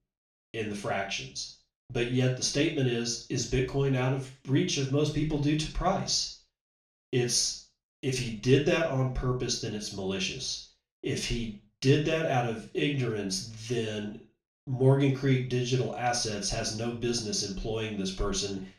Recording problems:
off-mic speech; far
room echo; noticeable; dies away in 0.3 s

